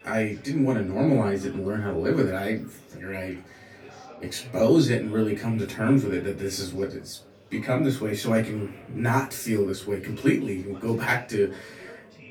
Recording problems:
off-mic speech; far
room echo; very slight; dies away in 0.2 s
chatter from many people; faint; throughout; 20 dB below the speech

